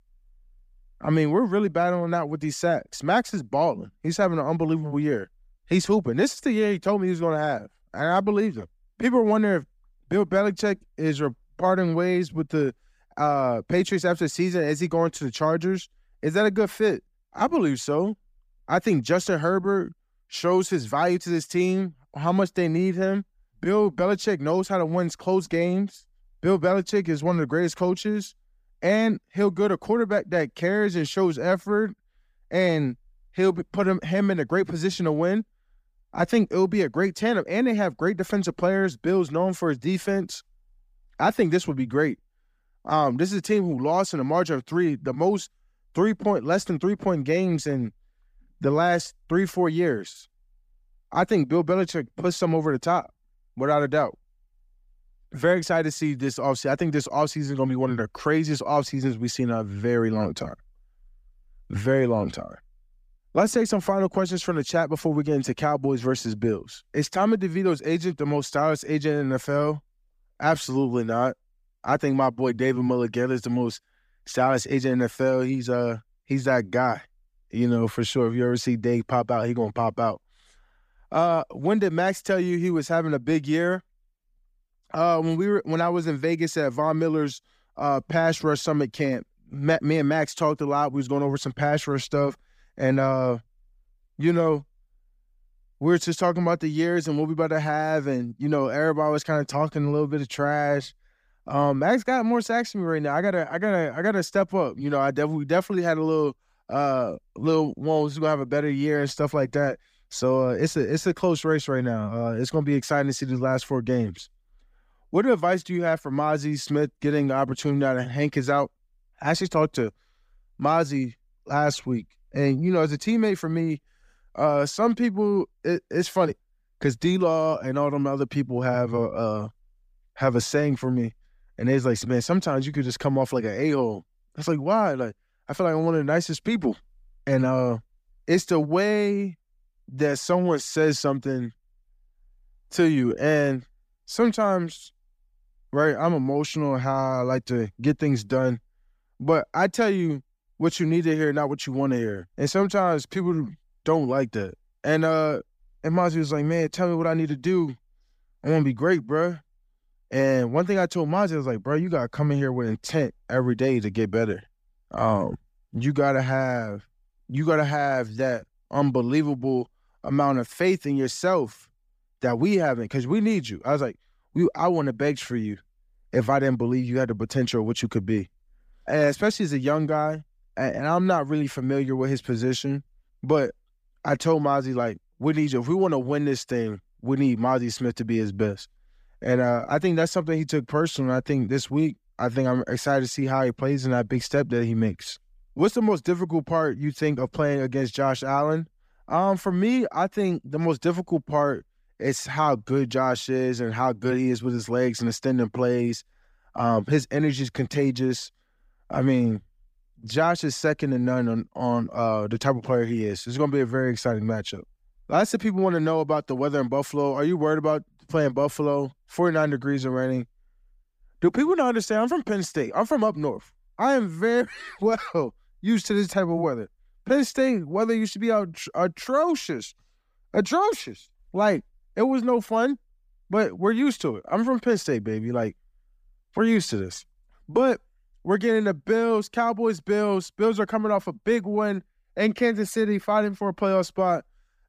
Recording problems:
none

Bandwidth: 15 kHz